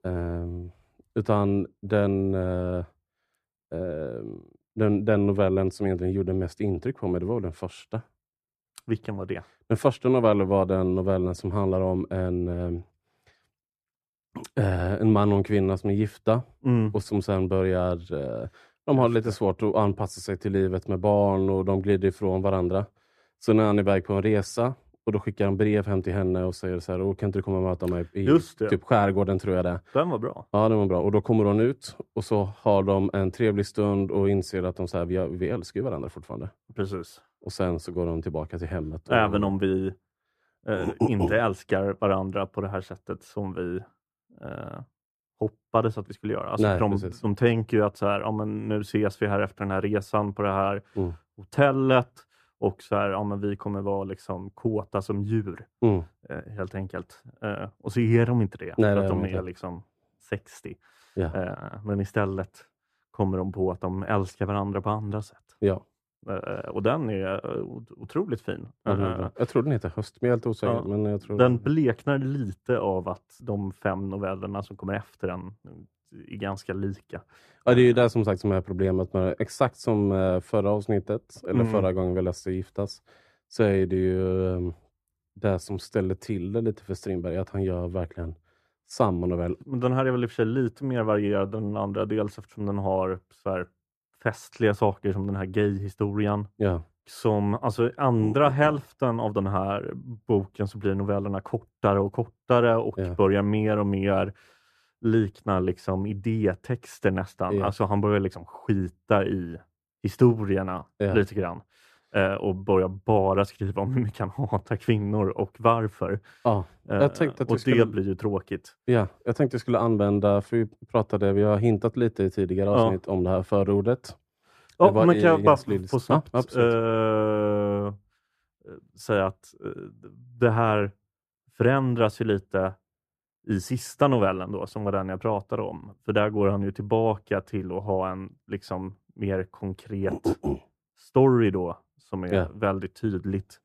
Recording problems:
muffled; very; fading above 2 kHz

